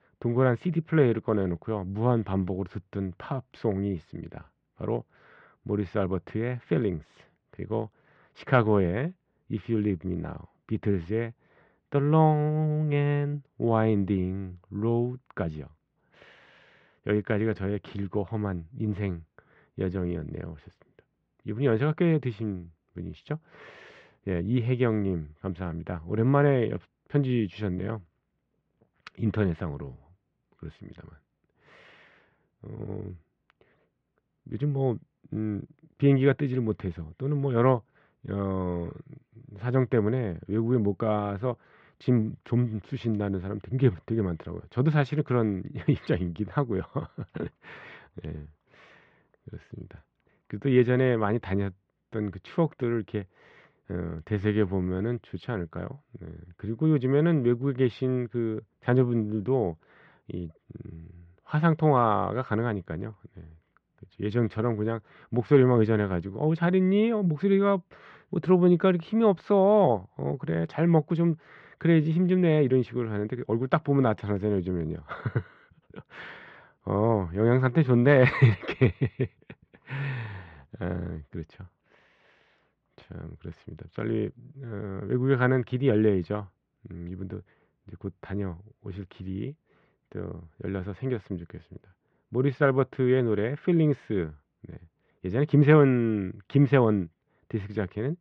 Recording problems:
muffled; very; fading above 3 kHz

